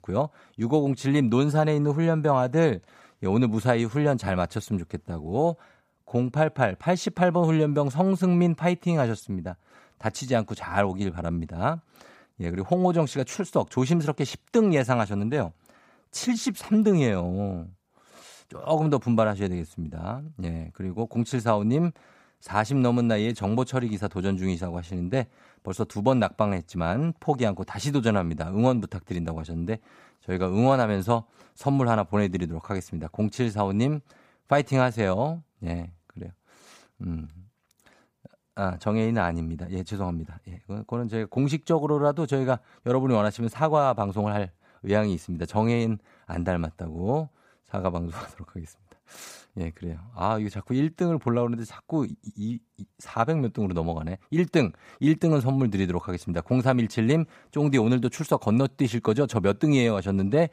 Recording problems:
none

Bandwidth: 15 kHz